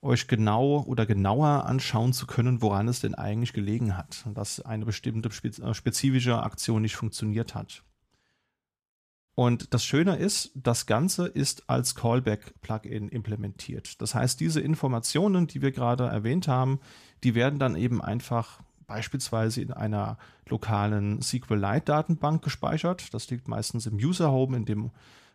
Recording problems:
none

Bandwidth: 14.5 kHz